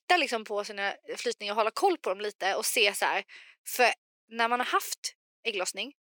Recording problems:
thin; somewhat; fading below 350 Hz

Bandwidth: 17 kHz